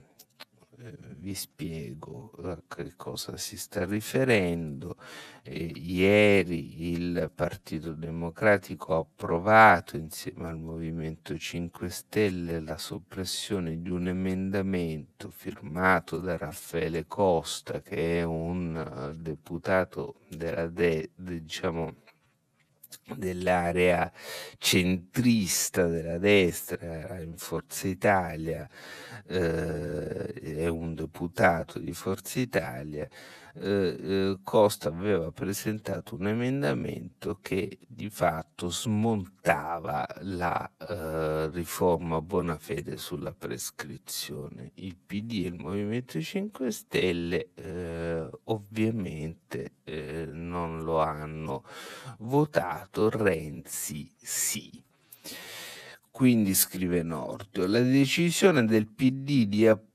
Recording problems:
wrong speed, natural pitch; too slow; 0.6 times normal speed

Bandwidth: 14 kHz